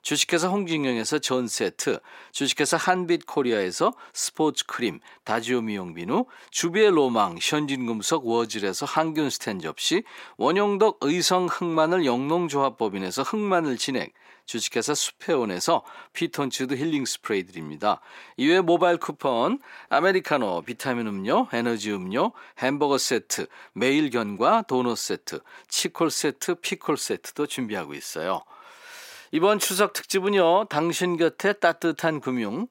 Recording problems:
thin; somewhat; fading below 350 Hz

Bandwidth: 16 kHz